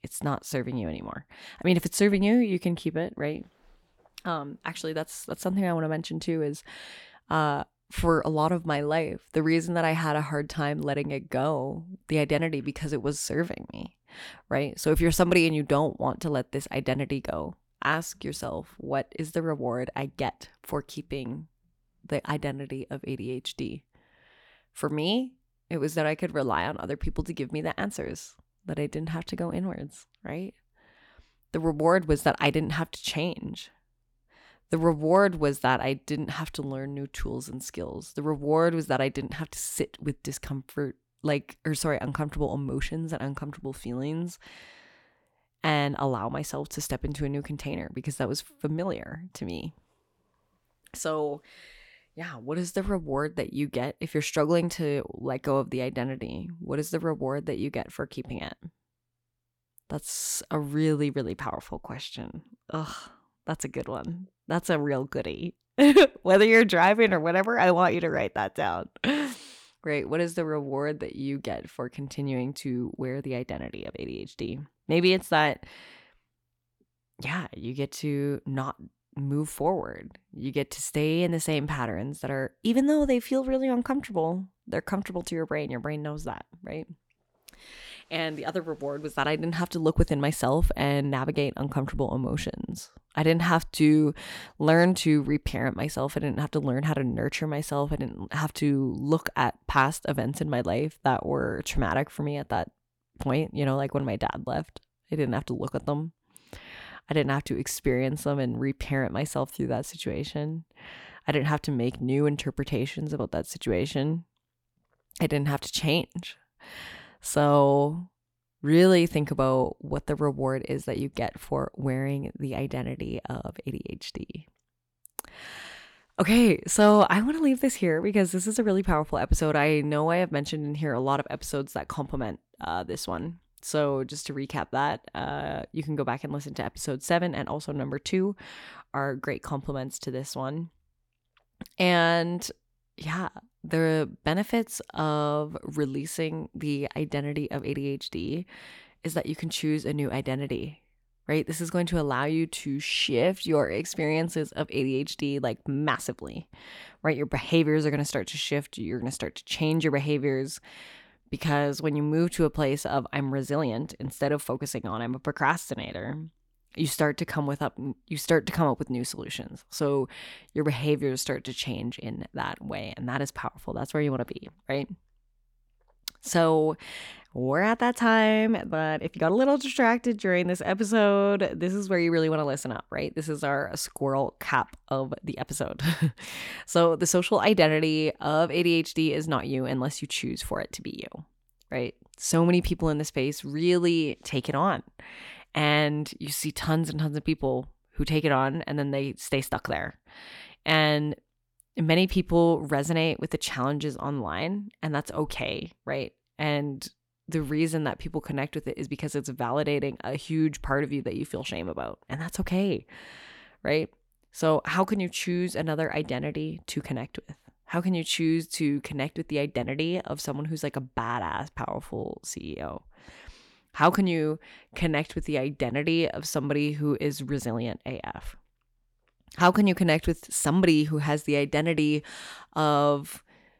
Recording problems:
none

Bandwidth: 17 kHz